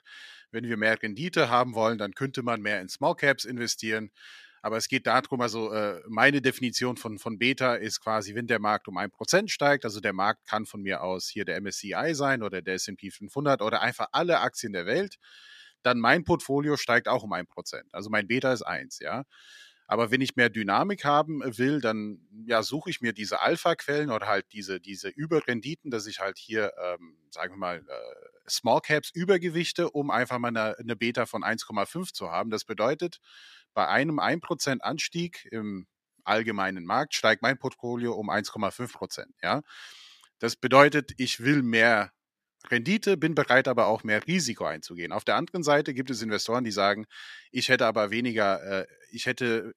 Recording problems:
thin; very slightly; fading below 550 Hz

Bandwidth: 14.5 kHz